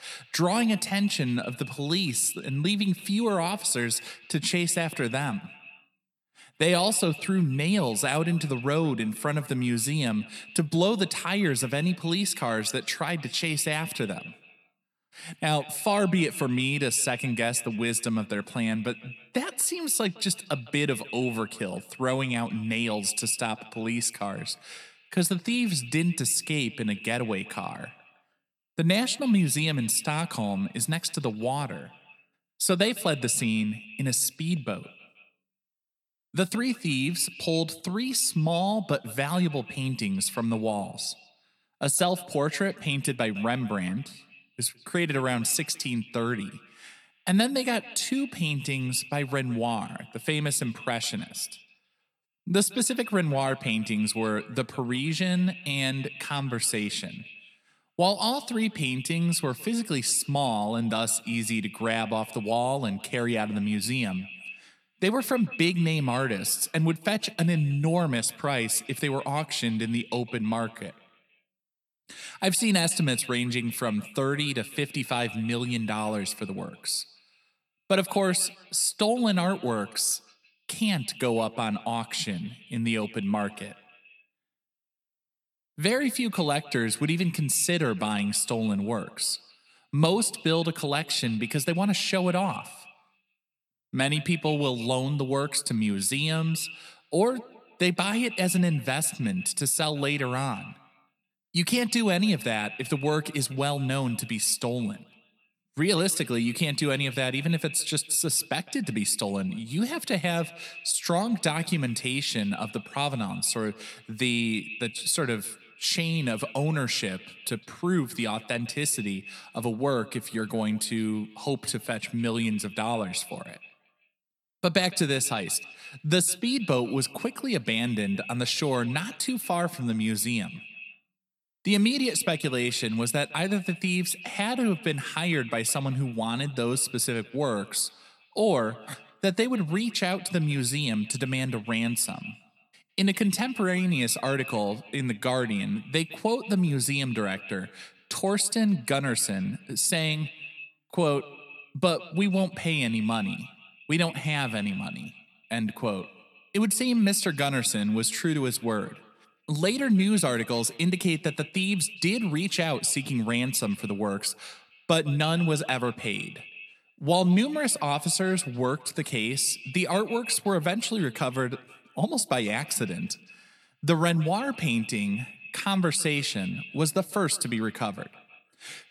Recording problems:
echo of what is said; noticeable; throughout; 160 ms later, 15 dB below the speech

